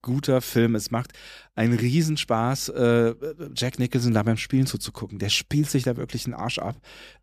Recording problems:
none

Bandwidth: 14.5 kHz